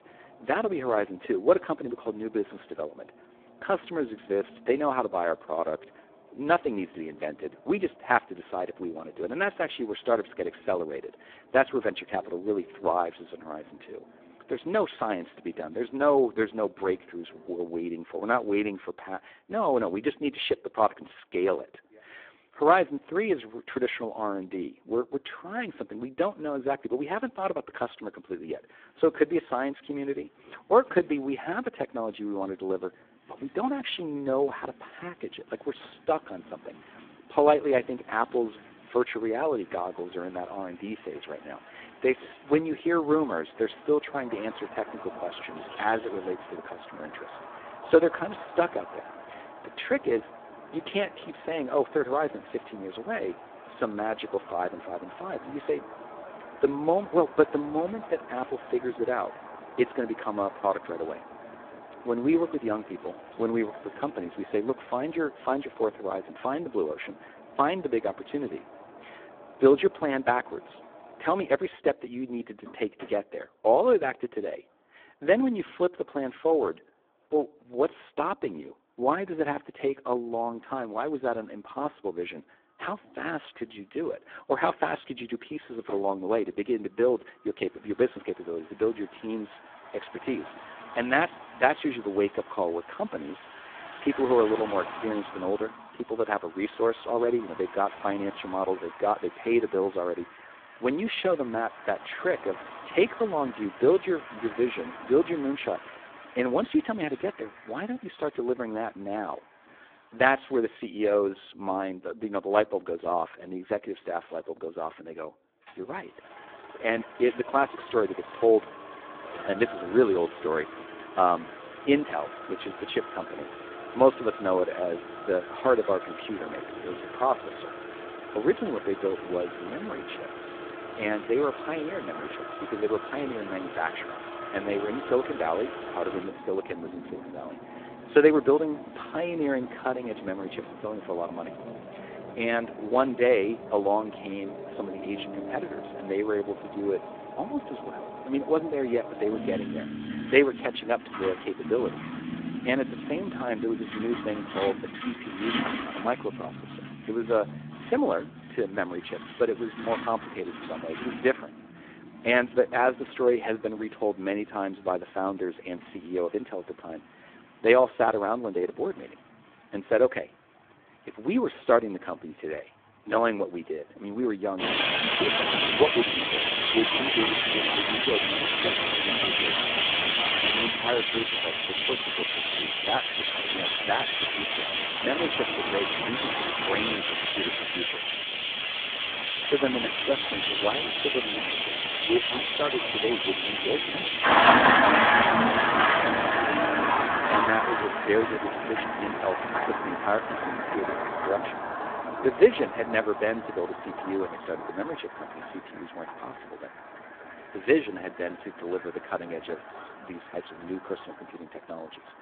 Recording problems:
phone-call audio; poor line
traffic noise; very loud; throughout; as loud as the speech

